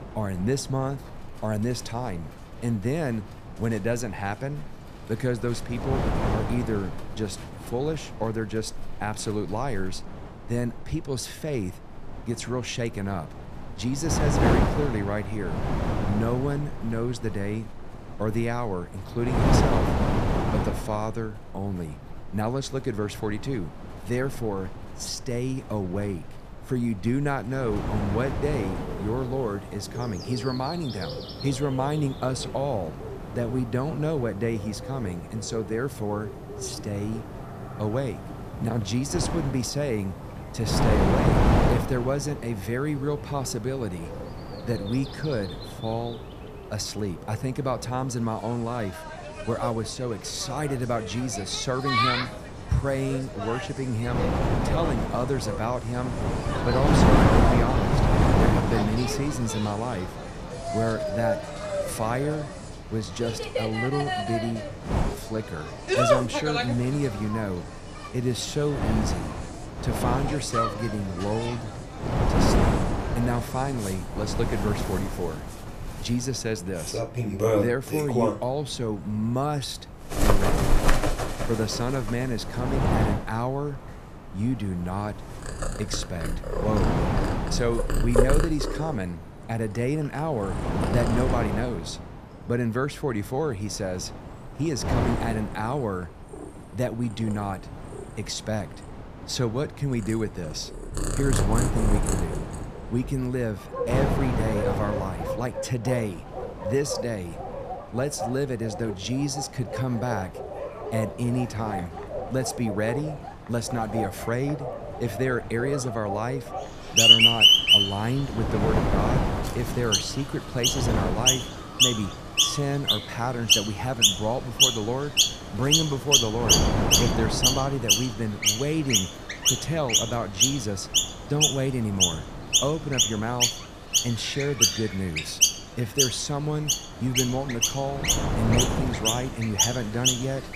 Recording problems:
animal sounds; very loud; throughout; 4 dB above the speech
wind noise on the microphone; heavy; 1 dB below the speech

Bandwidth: 14.5 kHz